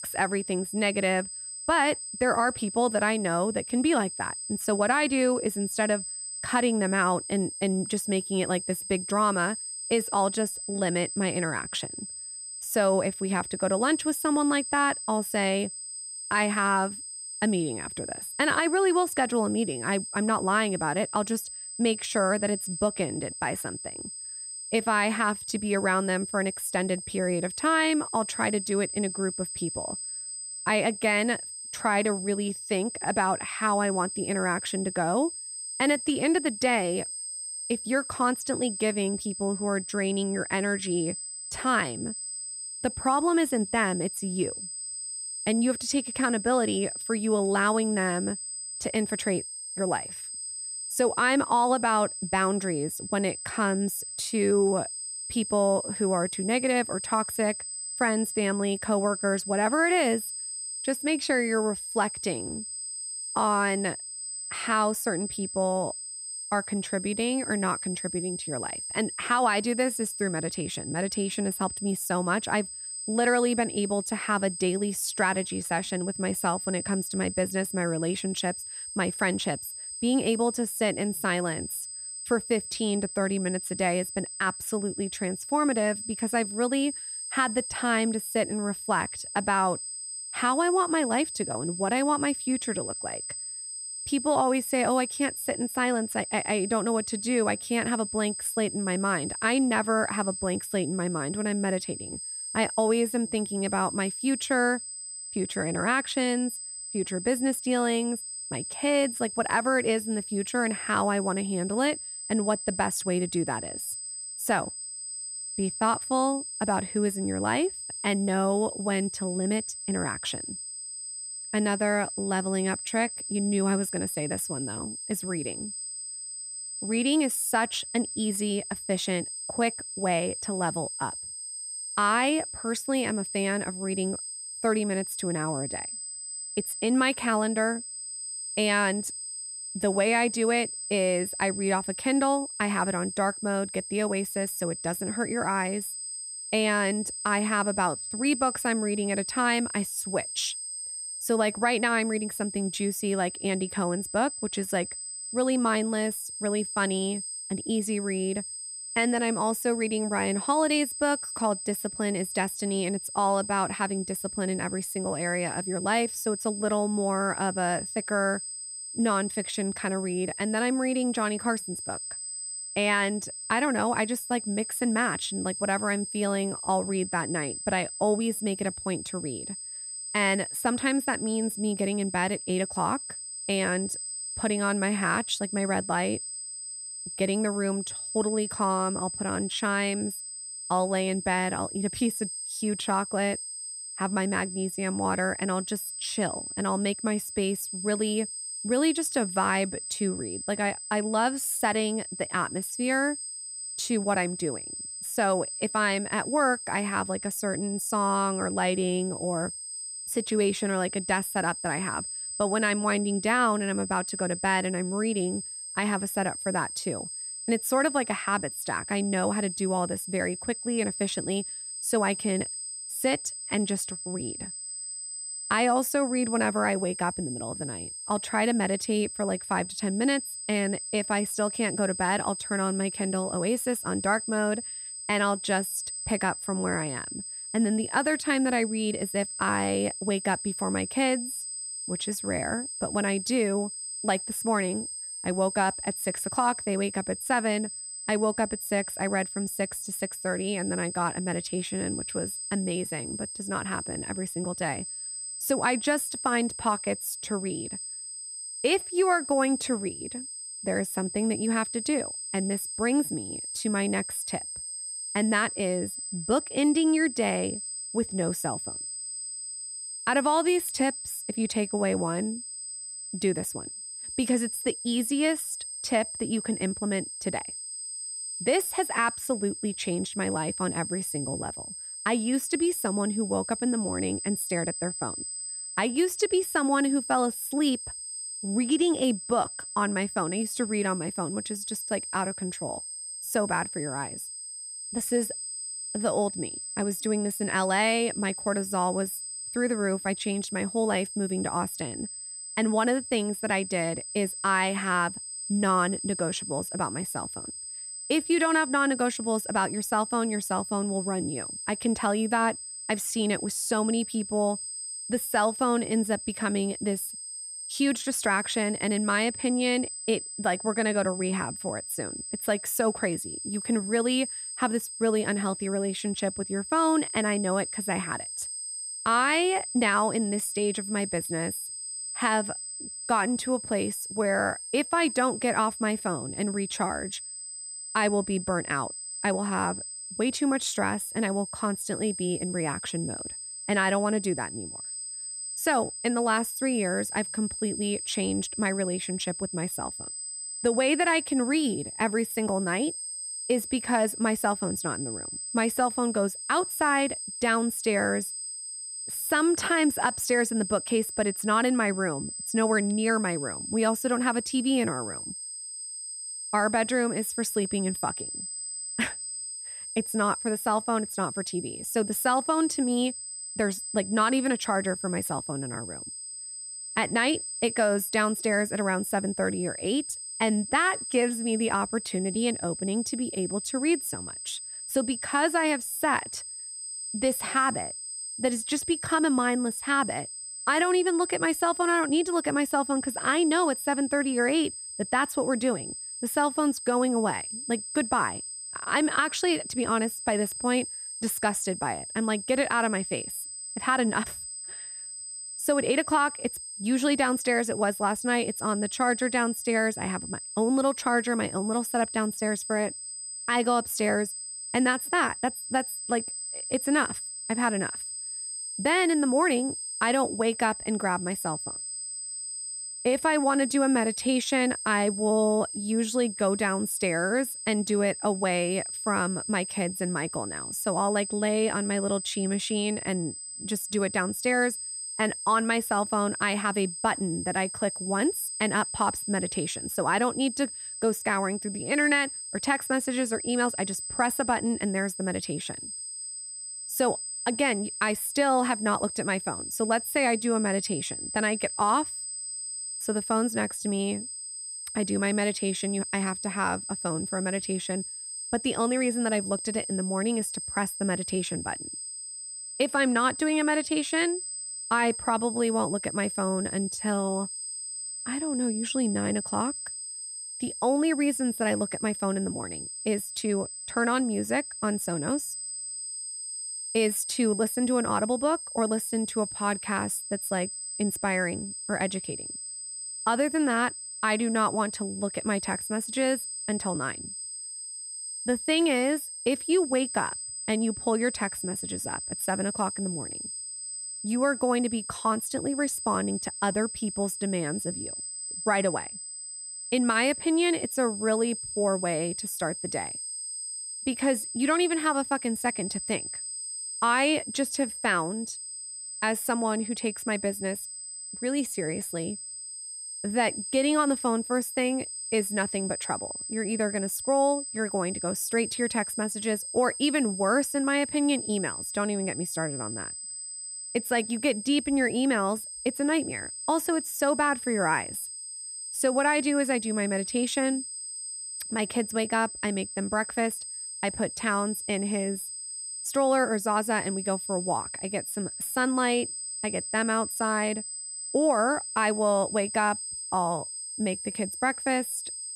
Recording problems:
high-pitched whine; loud; throughout; 8 kHz, 6 dB below the speech

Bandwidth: 14.5 kHz